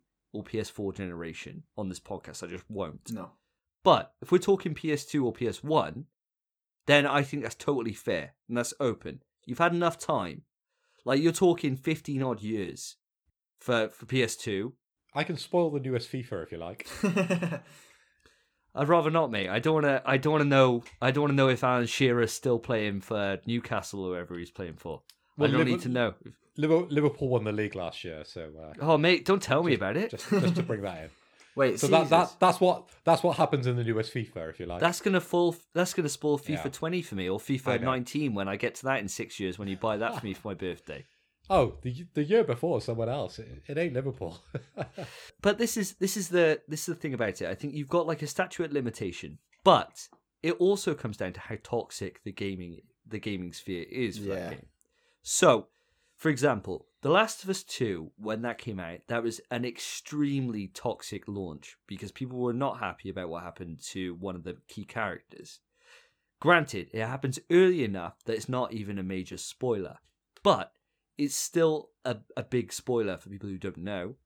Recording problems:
none

